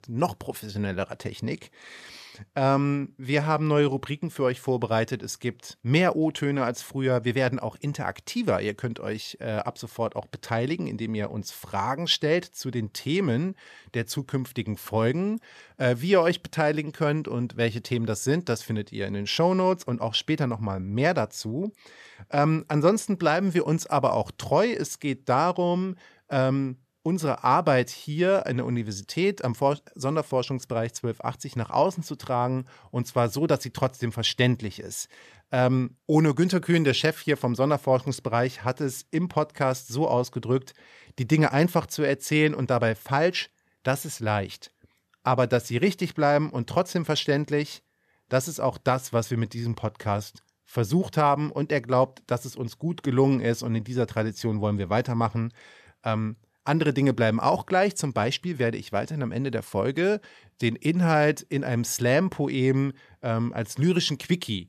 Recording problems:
none

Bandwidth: 14 kHz